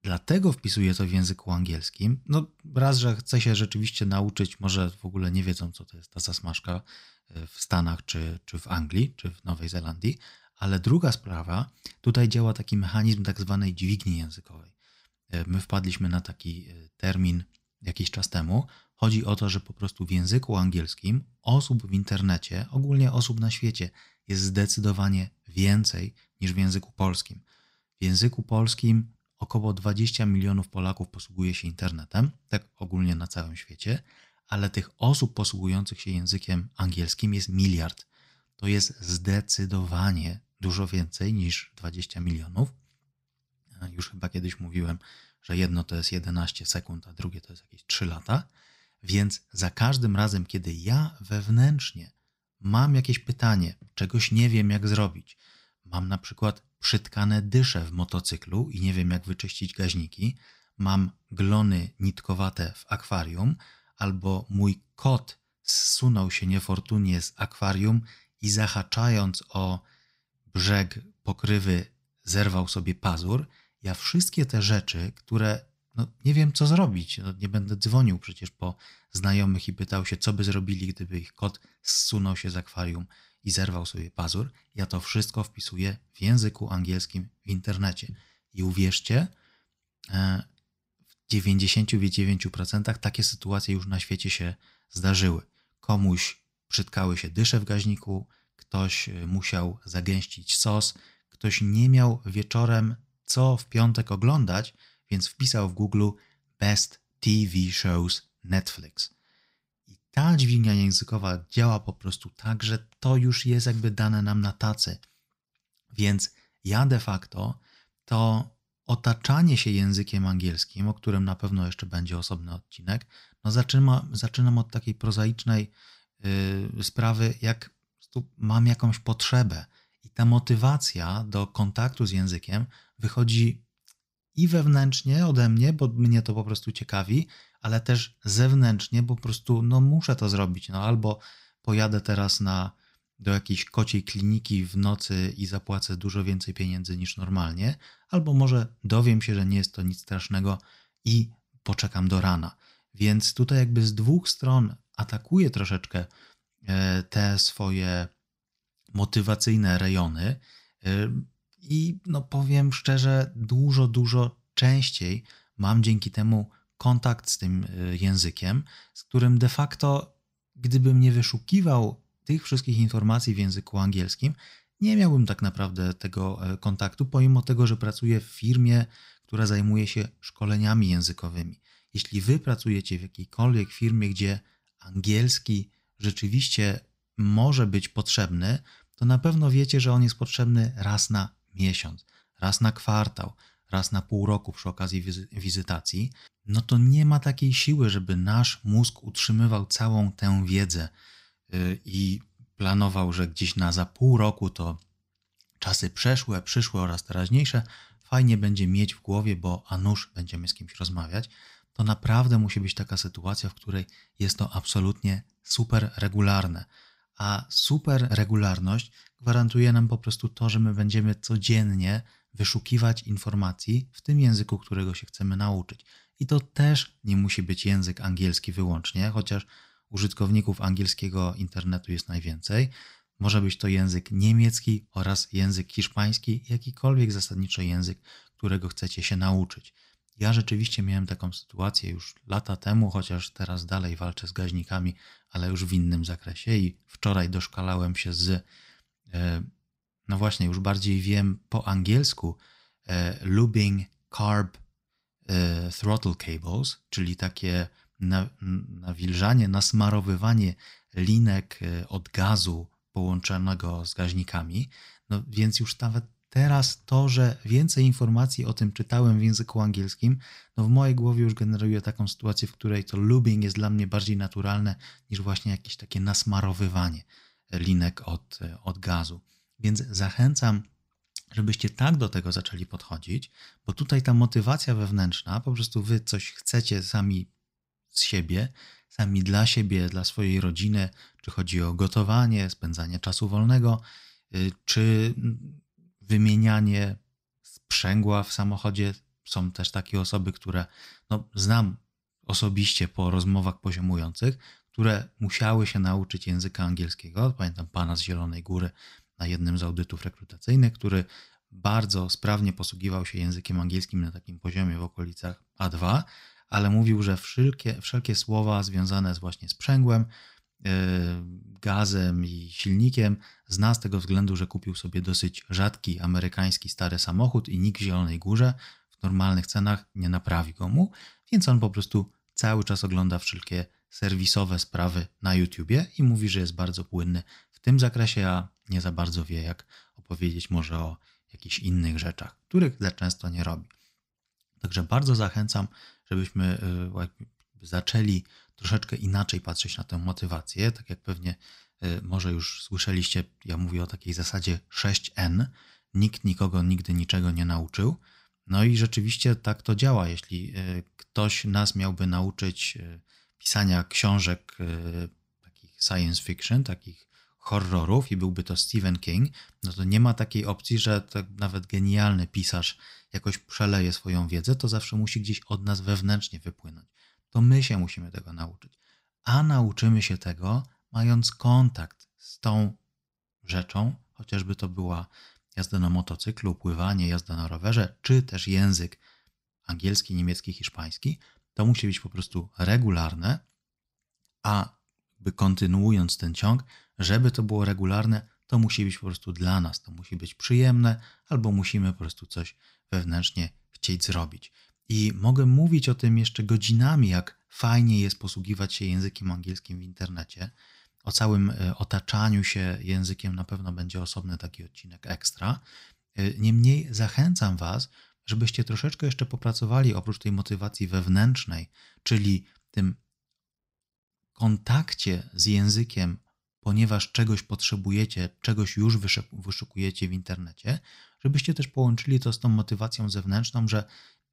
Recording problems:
none

